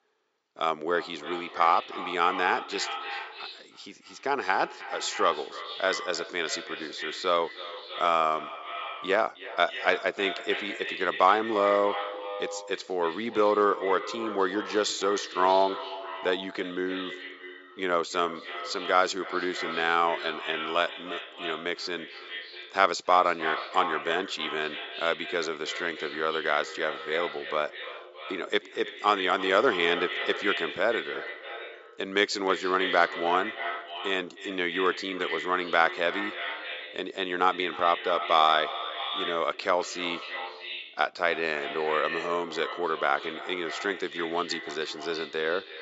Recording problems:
echo of what is said; strong; throughout; 310 ms later, 8 dB below the speech
thin; somewhat; fading below 300 Hz
high frequencies cut off; noticeable; nothing above 8 kHz

